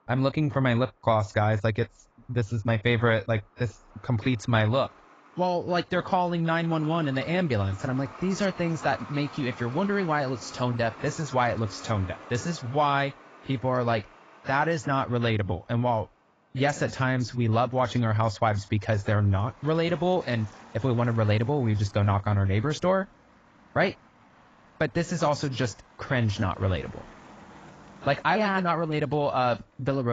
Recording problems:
garbled, watery; badly; nothing above 7.5 kHz
traffic noise; faint; throughout; 20 dB below the speech
abrupt cut into speech; at the end

